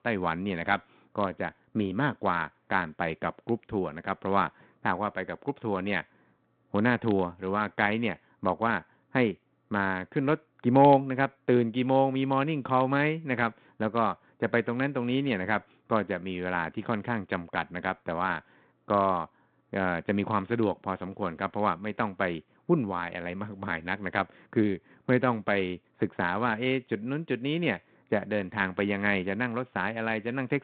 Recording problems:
phone-call audio; nothing above 4 kHz

